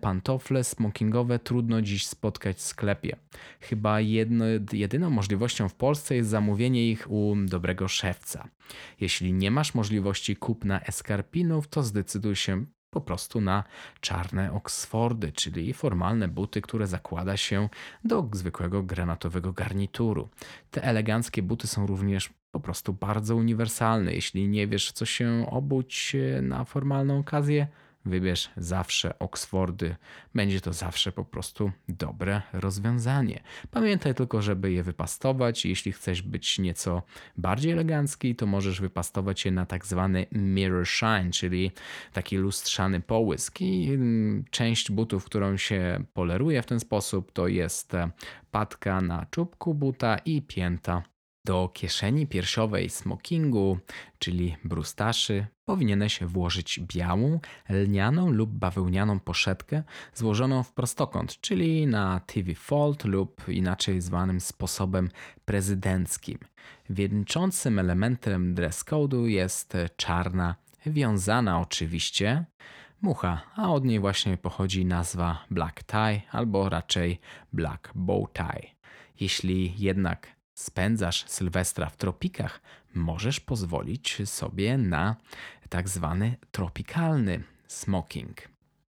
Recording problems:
none

